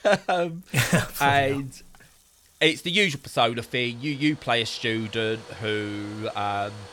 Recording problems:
household noises; faint; throughout; 25 dB below the speech

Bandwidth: 17.5 kHz